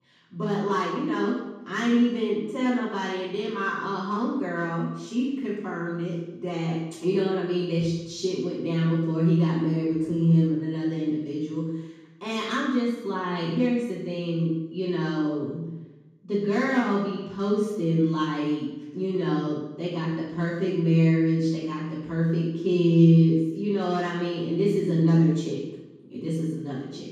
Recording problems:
room echo; strong; dies away in 1.1 s
off-mic speech; far

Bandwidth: 15 kHz